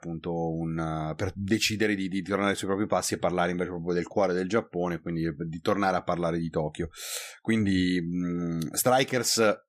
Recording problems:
none

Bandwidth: 15 kHz